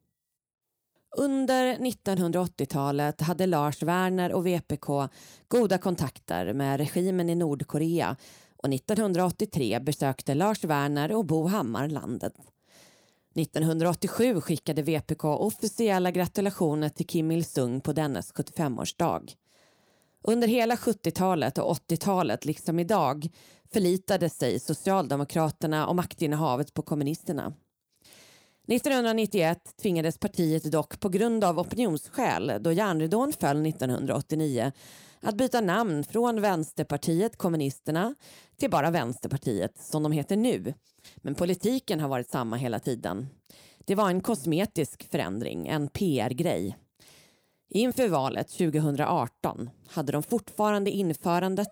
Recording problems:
none

